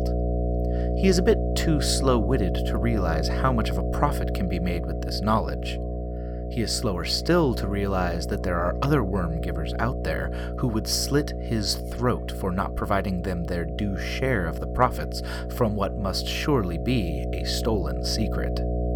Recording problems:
electrical hum; loud; throughout; 60 Hz, 7 dB below the speech

